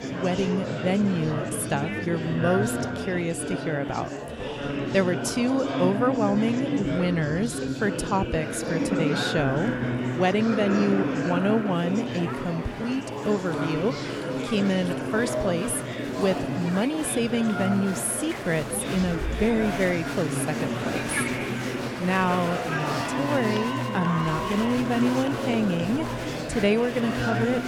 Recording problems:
murmuring crowd; loud; throughout; 3 dB below the speech

